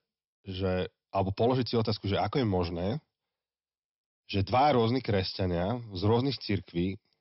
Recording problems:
high frequencies cut off; noticeable; nothing above 5.5 kHz

